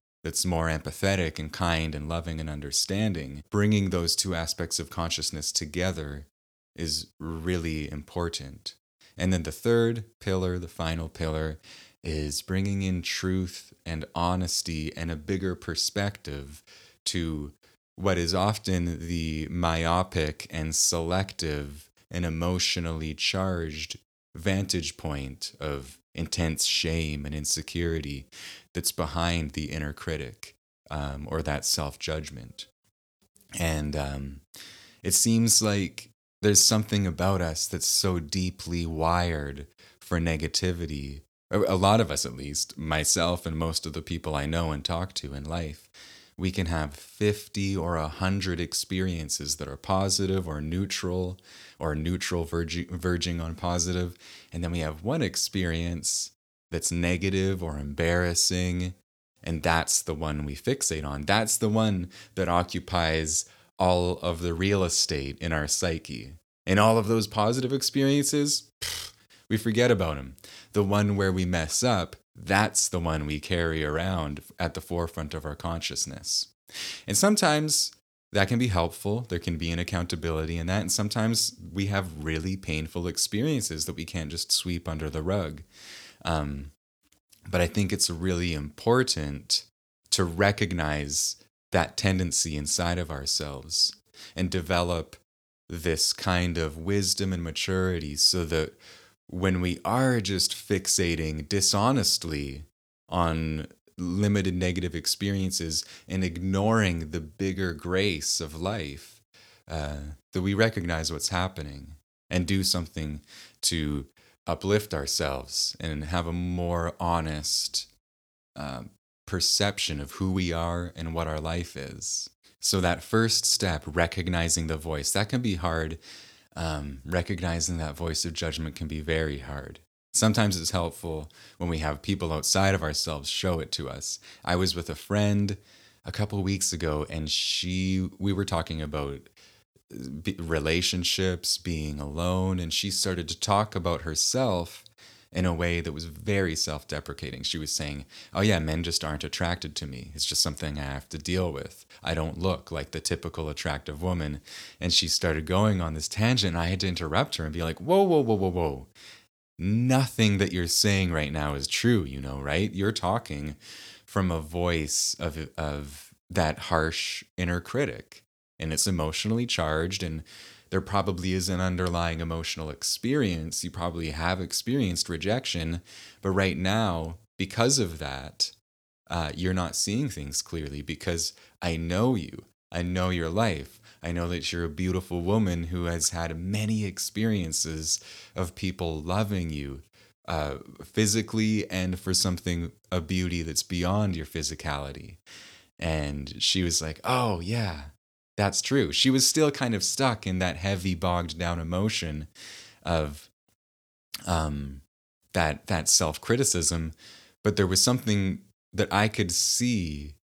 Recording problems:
none

